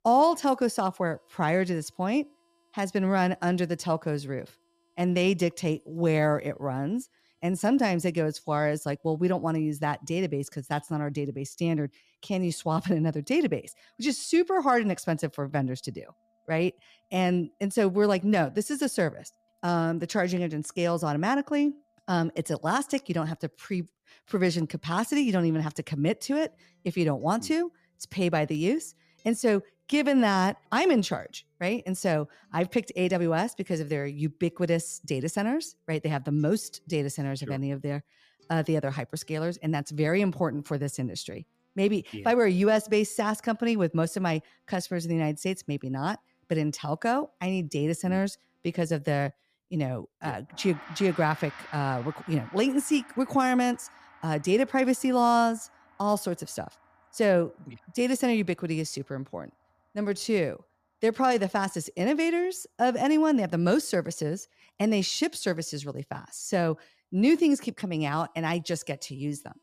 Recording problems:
background music; faint; throughout; 25 dB below the speech

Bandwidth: 14.5 kHz